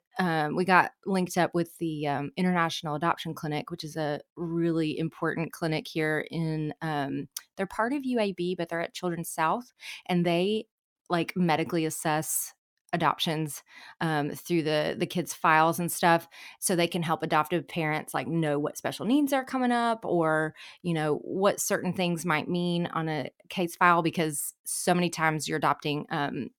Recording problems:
none

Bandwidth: 18.5 kHz